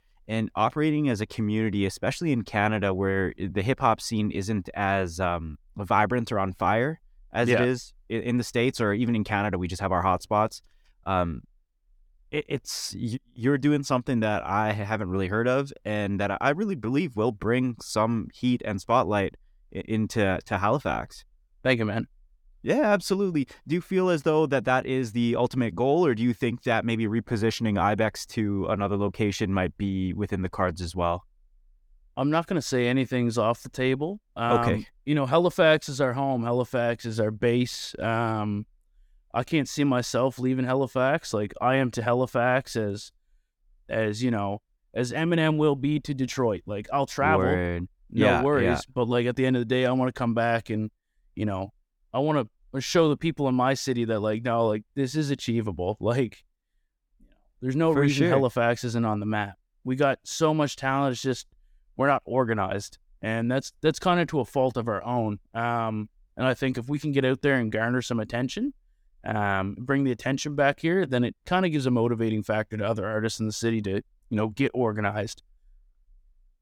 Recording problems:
none

